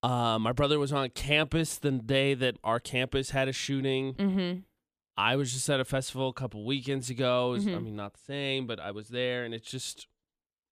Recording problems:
none

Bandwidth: 14.5 kHz